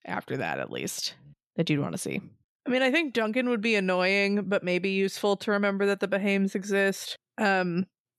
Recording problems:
none

